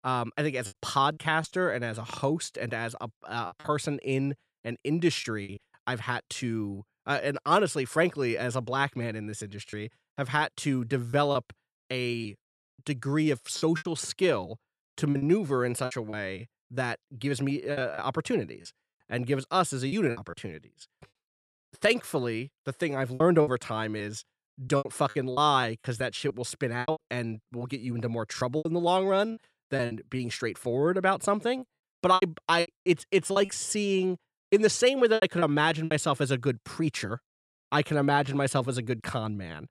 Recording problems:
choppy; very; 7% of the speech affected

